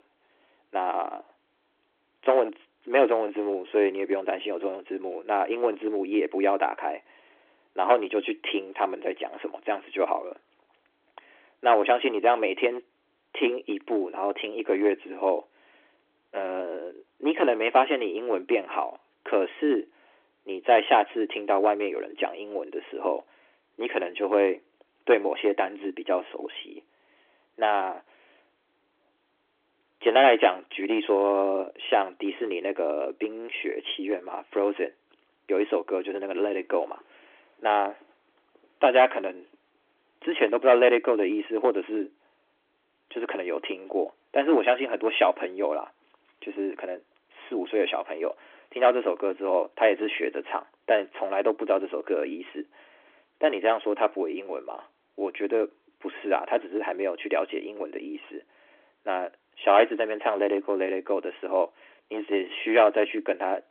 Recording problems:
phone-call audio; nothing above 3.5 kHz
distortion; slight; 2% of the sound clipped

